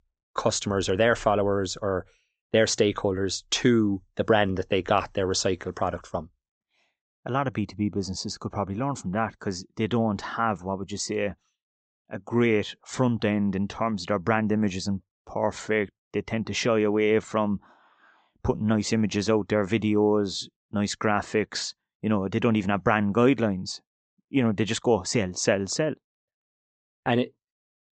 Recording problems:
high frequencies cut off; noticeable; nothing above 8 kHz

